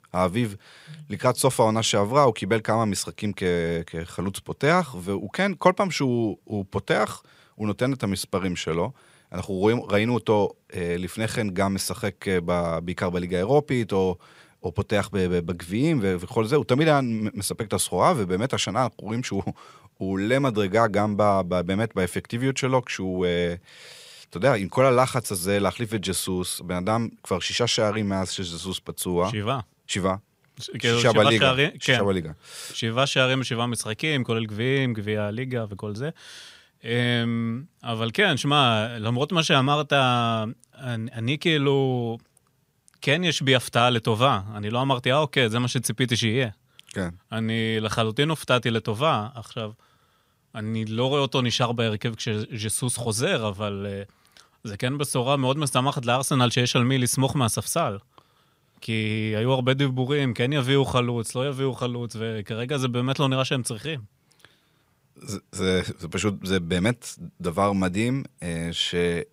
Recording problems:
none

